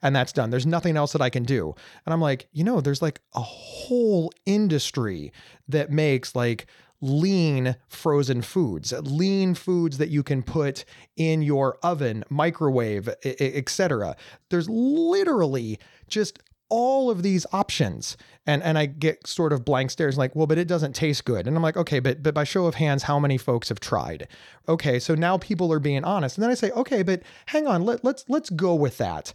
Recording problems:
none

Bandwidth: 18.5 kHz